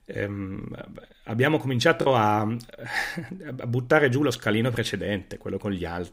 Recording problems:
choppy; occasionally; at 2 s; 4% of the speech affected

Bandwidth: 15.5 kHz